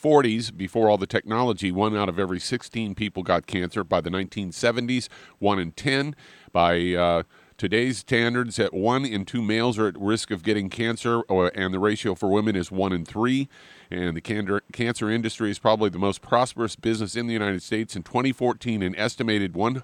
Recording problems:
none

